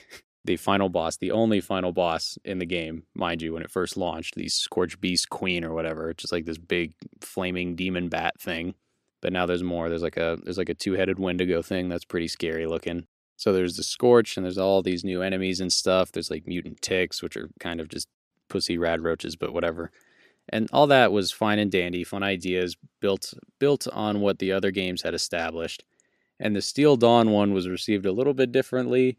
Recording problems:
none

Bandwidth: 14.5 kHz